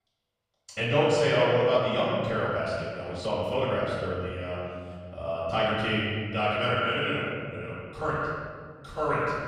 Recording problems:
echo of what is said; strong; throughout; 130 ms later, 8 dB below the speech
room echo; strong; dies away in 1.9 s
off-mic speech; far
uneven, jittery; strongly; from 0.5 to 8 s

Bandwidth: 15 kHz